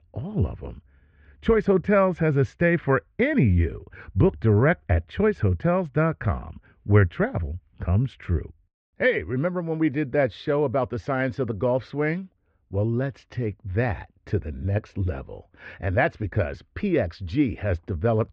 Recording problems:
muffled; very; fading above 2.5 kHz

